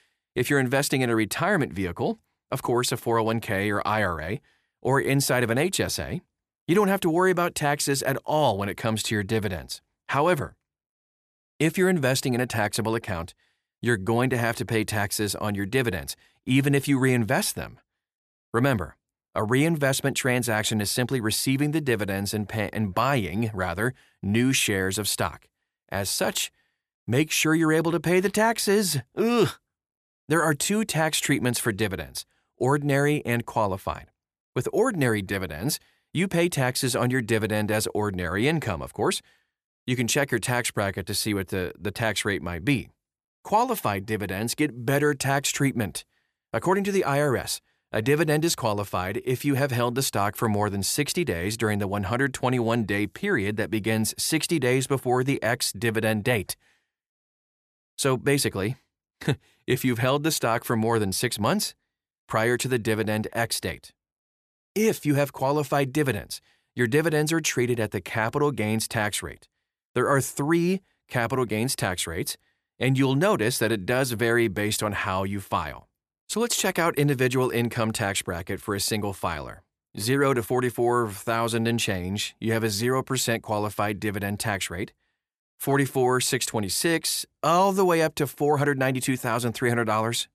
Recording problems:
none

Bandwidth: 14.5 kHz